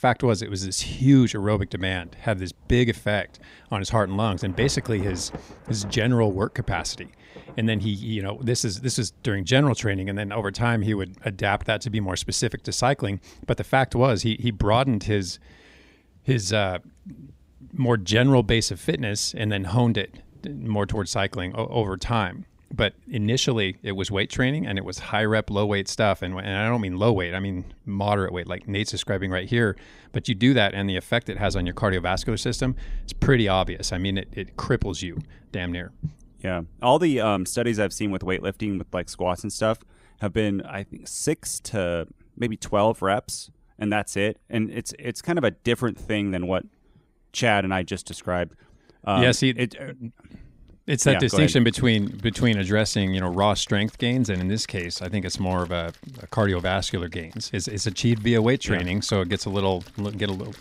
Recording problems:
rain or running water; faint; throughout; 25 dB below the speech

